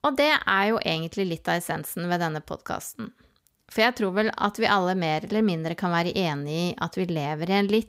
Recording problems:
none

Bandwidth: 15.5 kHz